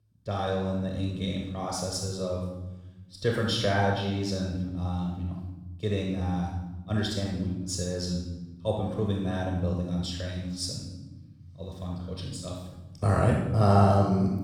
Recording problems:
room echo; noticeable; dies away in 1.2 s
off-mic speech; somewhat distant

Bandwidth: 17.5 kHz